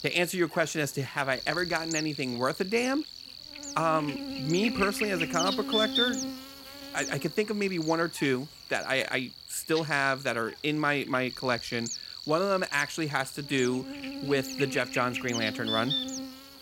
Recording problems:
electrical hum; loud; throughout; 60 Hz, 6 dB below the speech

